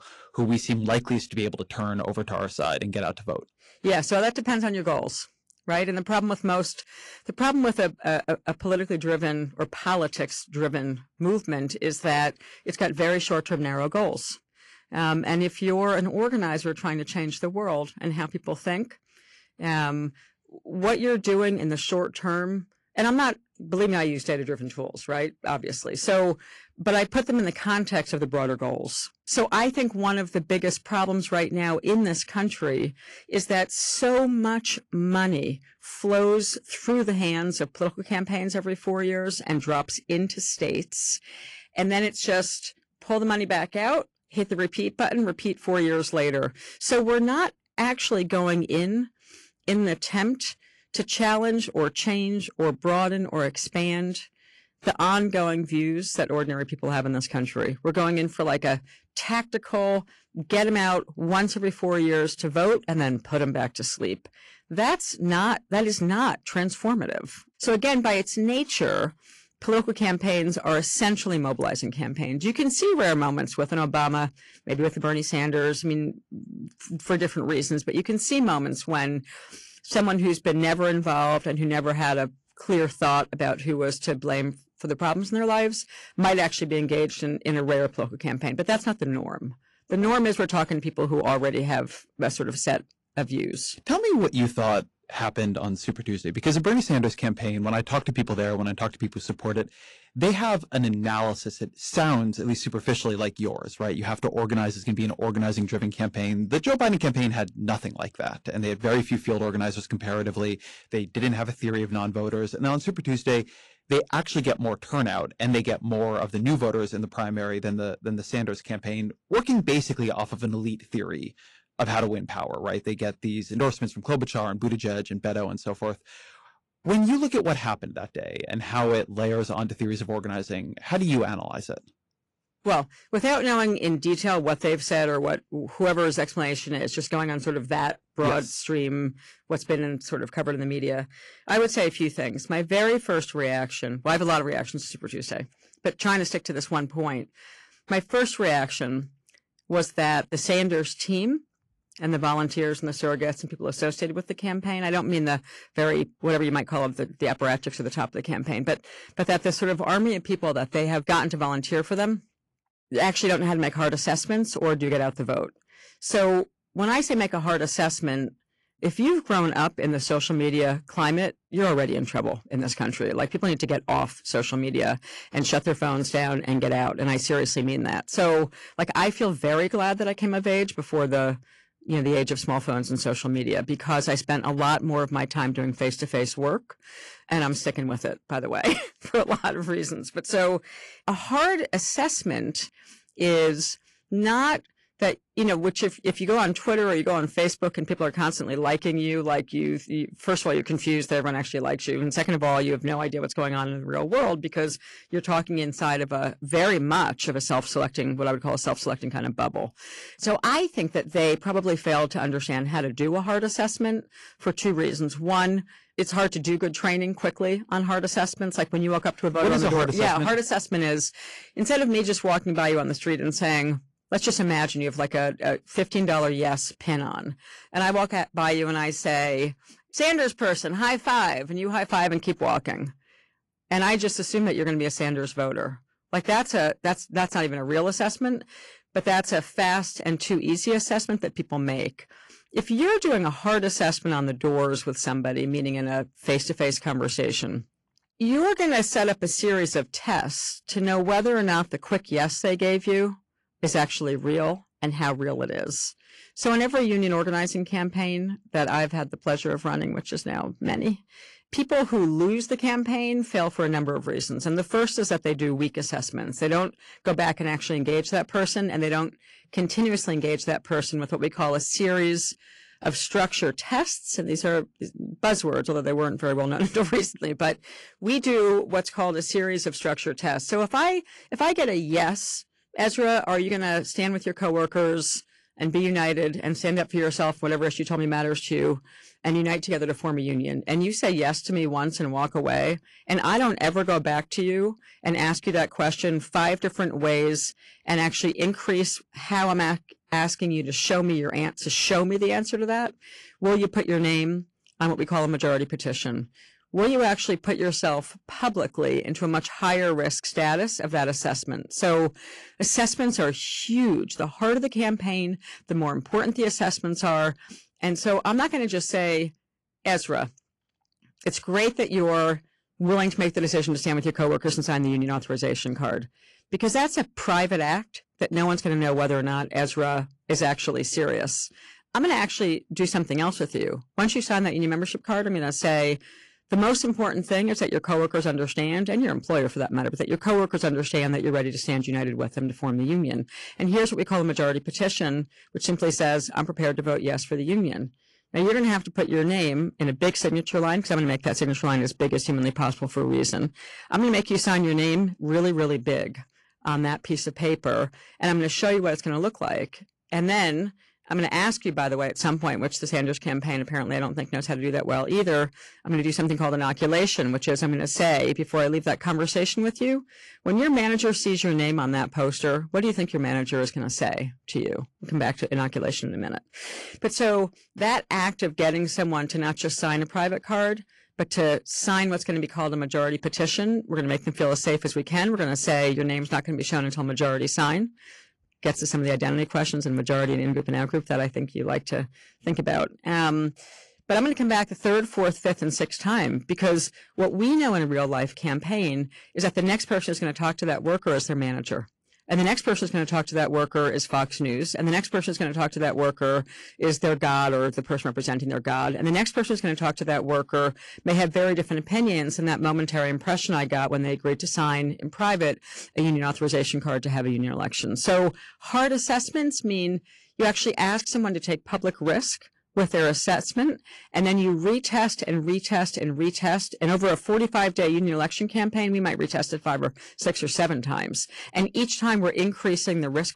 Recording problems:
distortion; slight; 6% of the sound clipped
garbled, watery; slightly

